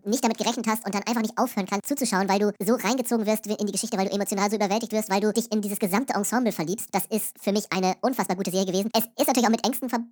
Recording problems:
wrong speed and pitch; too fast and too high; 1.7 times normal speed

